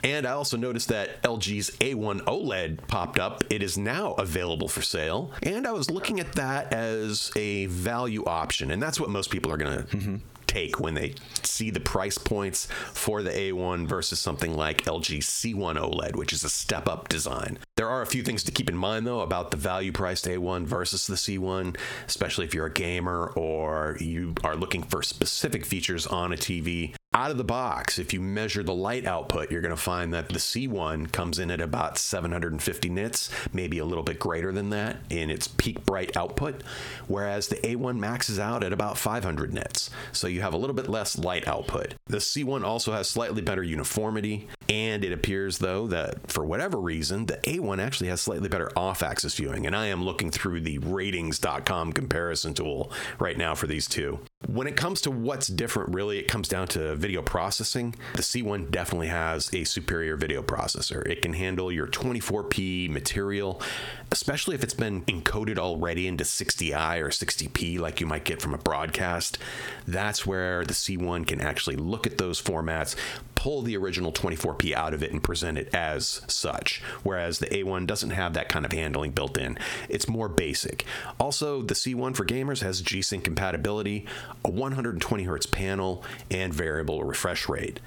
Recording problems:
squashed, flat; heavily

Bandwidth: 18.5 kHz